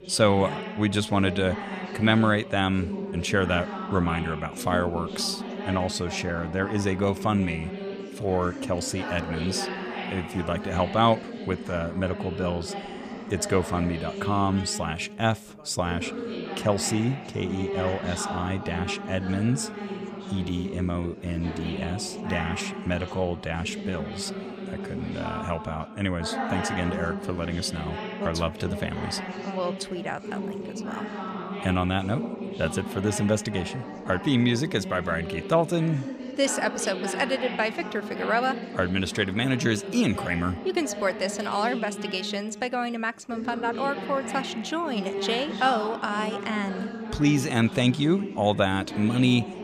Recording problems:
background chatter; loud; throughout; 4 voices, 7 dB below the speech

